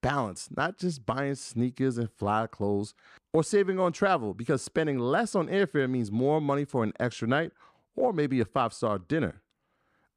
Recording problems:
none

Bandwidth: 14.5 kHz